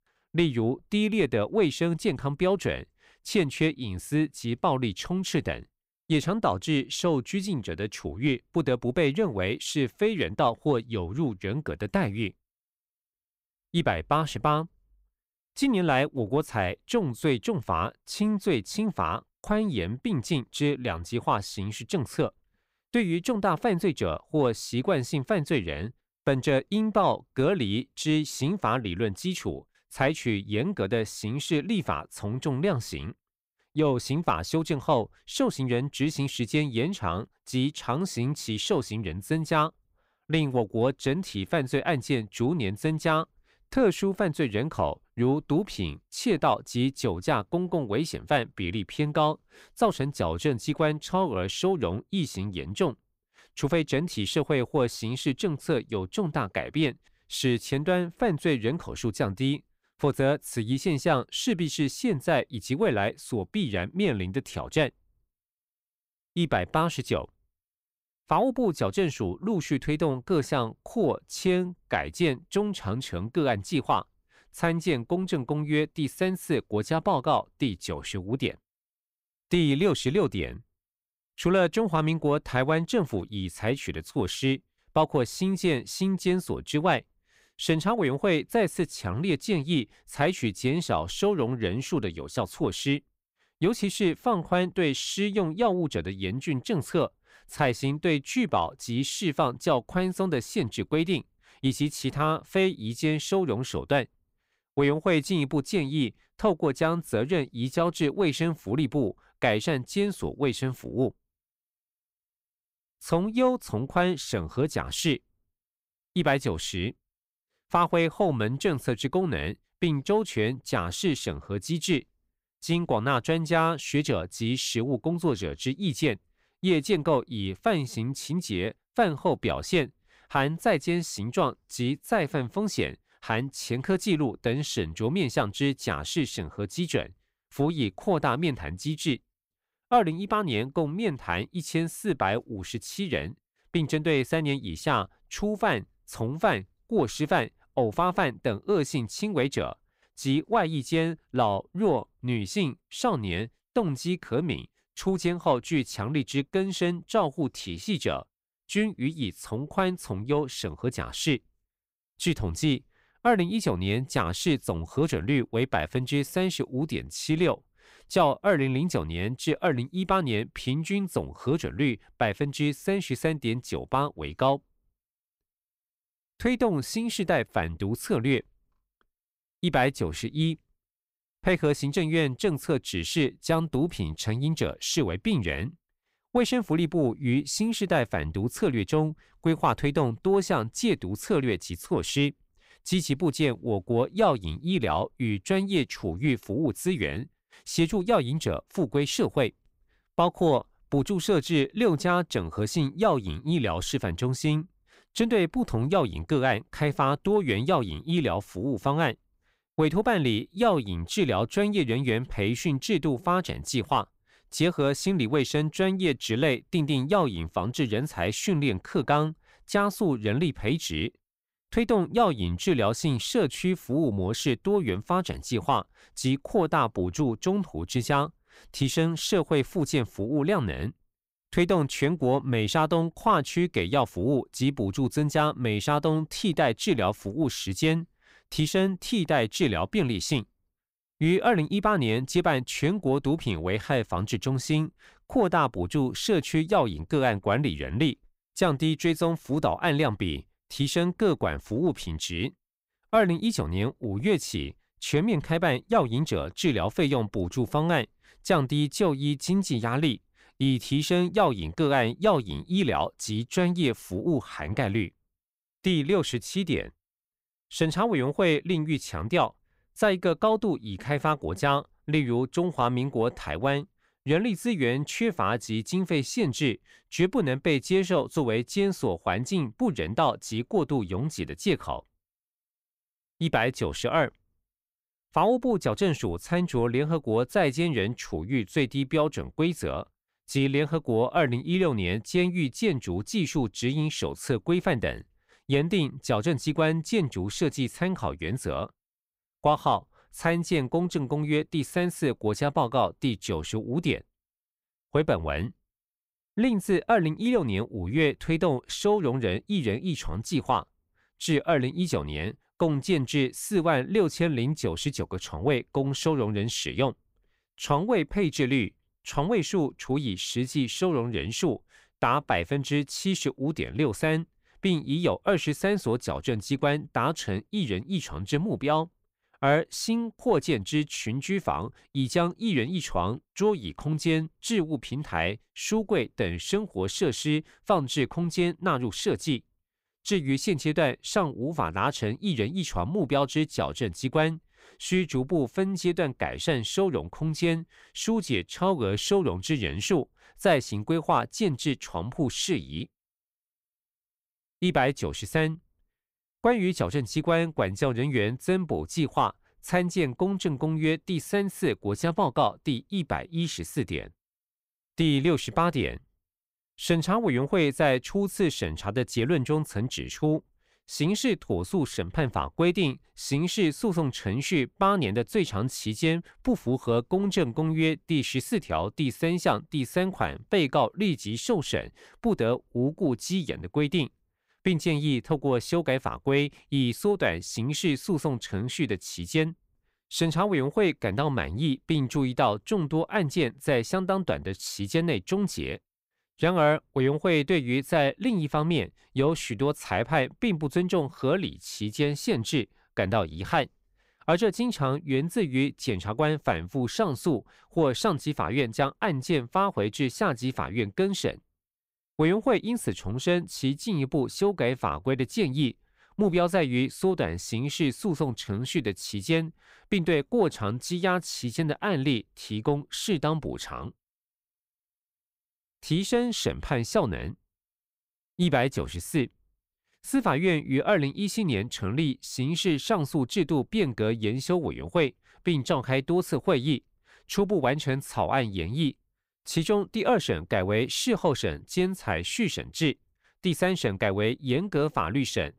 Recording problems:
none

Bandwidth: 15.5 kHz